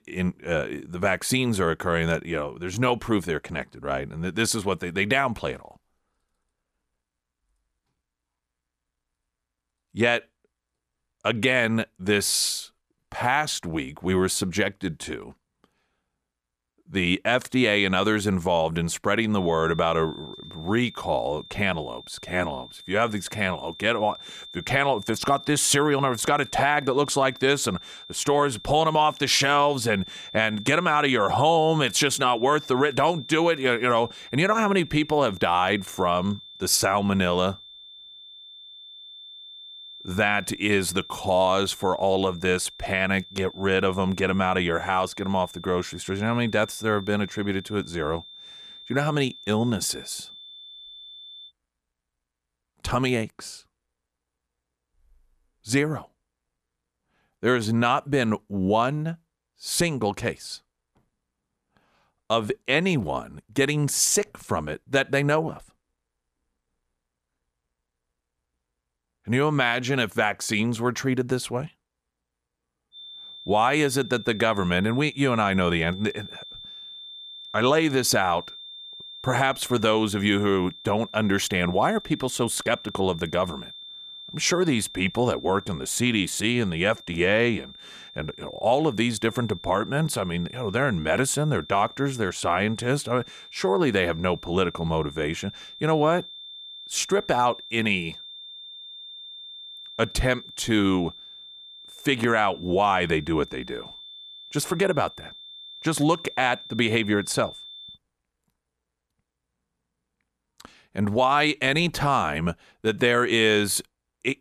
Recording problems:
high-pitched whine; noticeable; from 19 to 51 s and from 1:13 to 1:48; 3.5 kHz, 15 dB below the speech

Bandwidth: 14.5 kHz